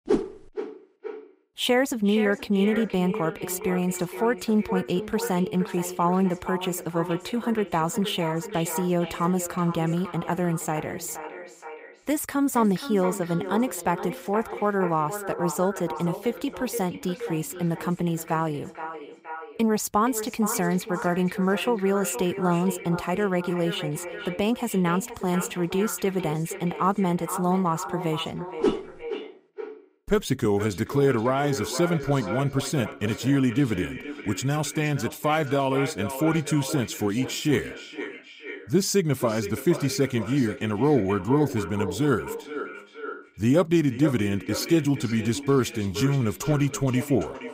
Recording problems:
echo of what is said; strong; throughout; 470 ms later, 10 dB below the speech

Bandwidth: 15.5 kHz